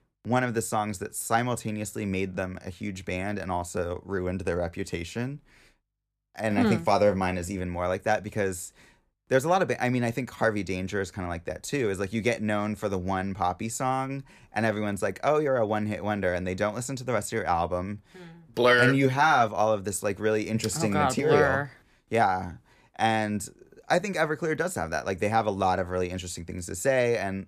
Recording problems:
none

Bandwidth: 14.5 kHz